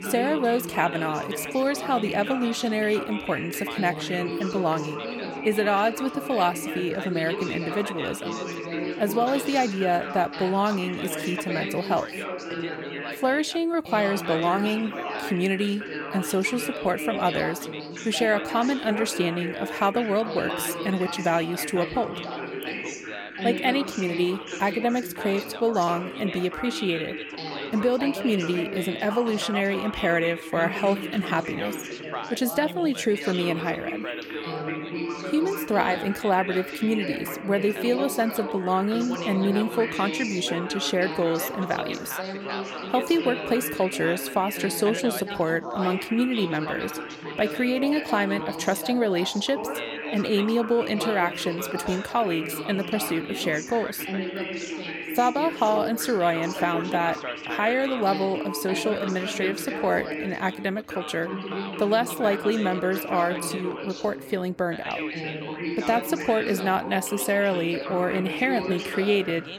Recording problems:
background chatter; loud; throughout; 3 voices, 6 dB below the speech

